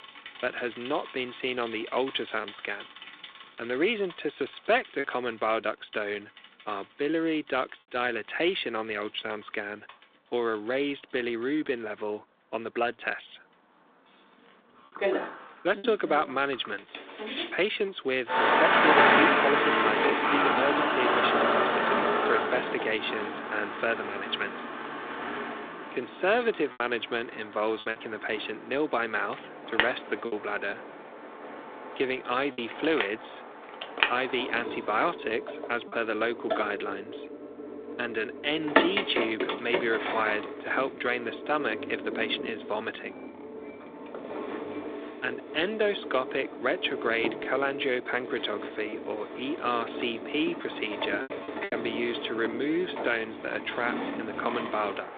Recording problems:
phone-call audio; nothing above 3.5 kHz
traffic noise; very loud; throughout; 1 dB above the speech
choppy; occasionally; 2% of the speech affected

